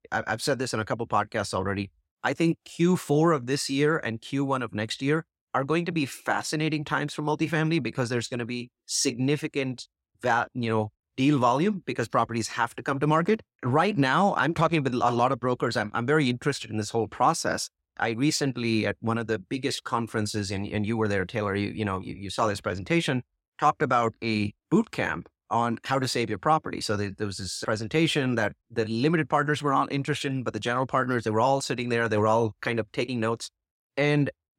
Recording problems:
none

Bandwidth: 16 kHz